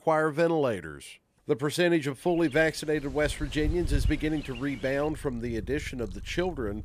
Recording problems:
animal sounds; noticeable; from 3 s on; 10 dB below the speech

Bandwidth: 15 kHz